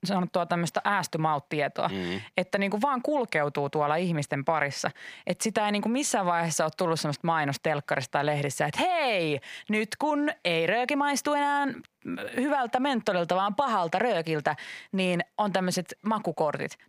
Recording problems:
squashed, flat; heavily

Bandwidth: 15 kHz